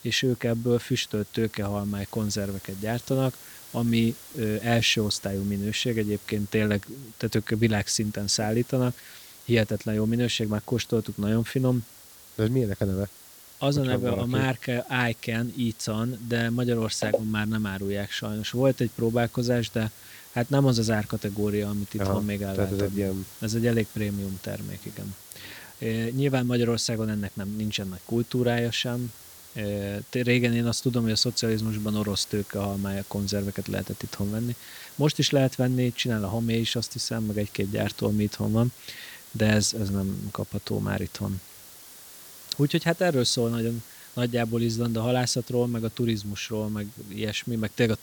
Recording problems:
hiss; noticeable; throughout; 20 dB below the speech

